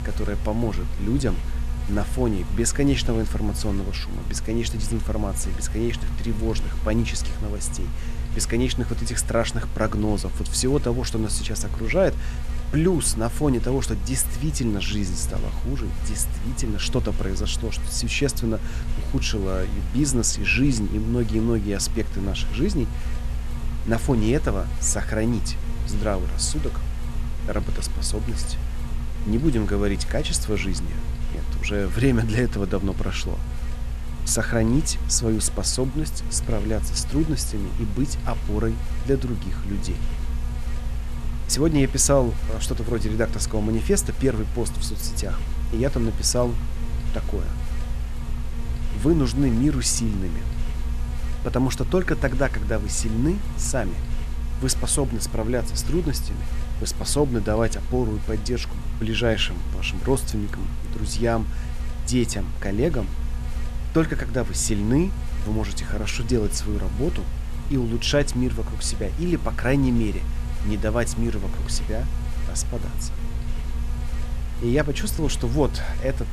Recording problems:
electrical hum; very faint; throughout; 60 Hz, 15 dB below the speech

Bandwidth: 13.5 kHz